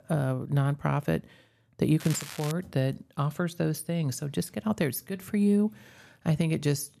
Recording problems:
crackling; noticeable; at 2 s; 10 dB below the speech

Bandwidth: 13.5 kHz